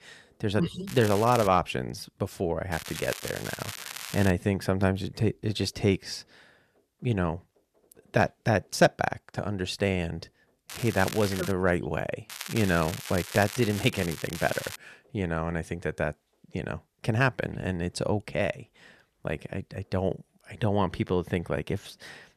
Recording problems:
crackling; loud; 4 times, first at 1 s; 9 dB below the speech

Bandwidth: 14 kHz